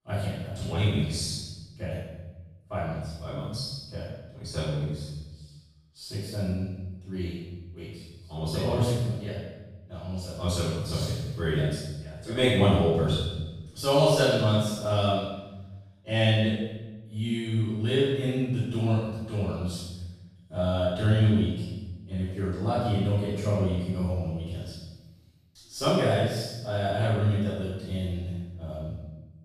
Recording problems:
room echo; strong; dies away in 1 s
off-mic speech; far

